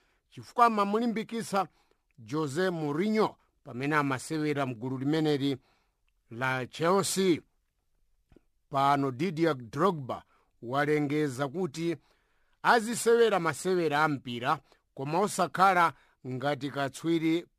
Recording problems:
none

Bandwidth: 14 kHz